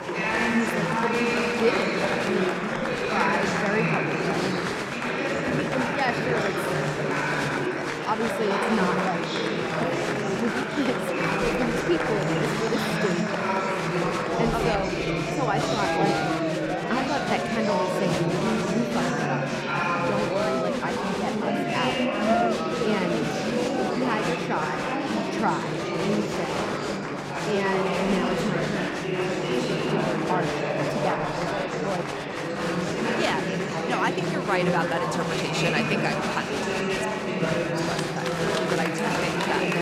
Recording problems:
murmuring crowd; very loud; throughout; 5 dB above the speech

